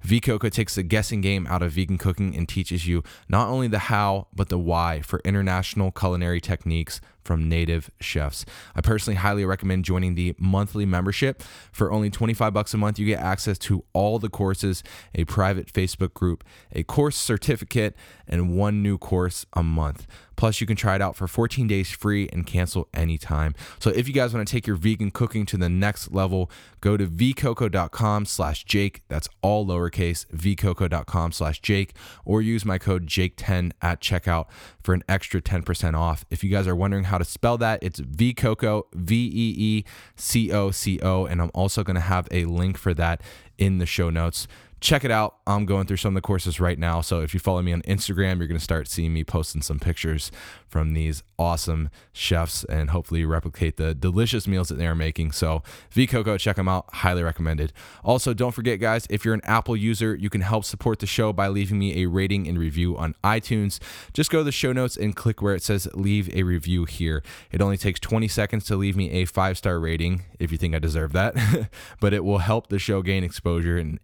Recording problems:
none

